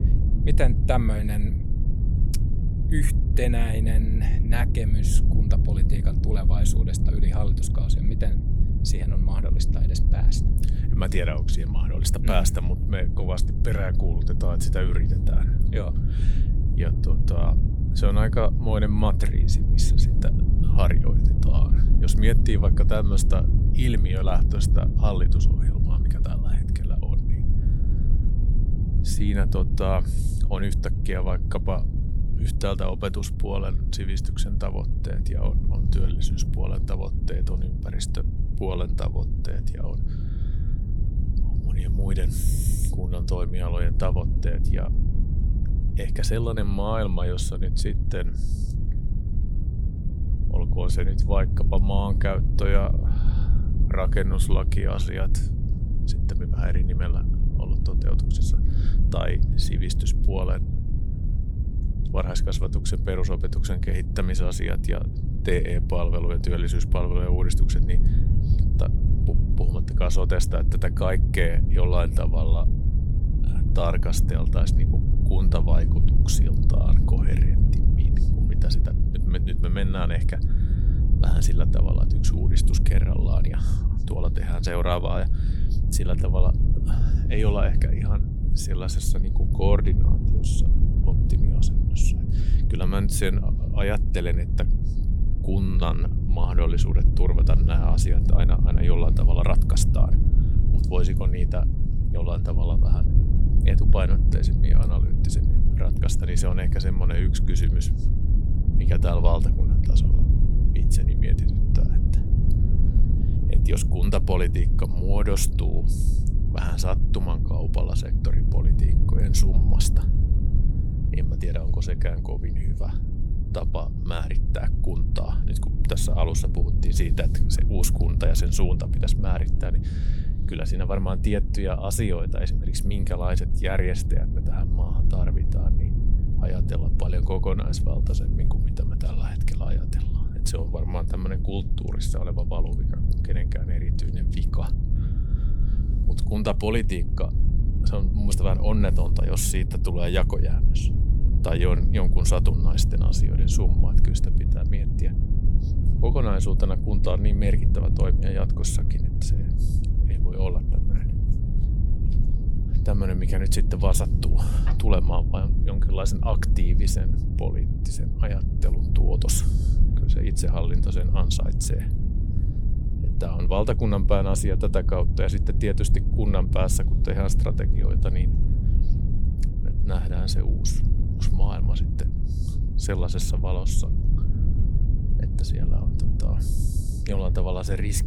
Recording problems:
low rumble; loud; throughout; 6 dB below the speech

